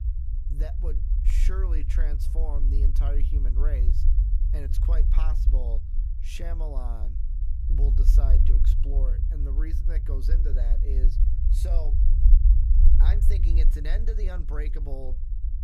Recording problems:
low rumble; loud; throughout; 4 dB below the speech

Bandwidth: 15.5 kHz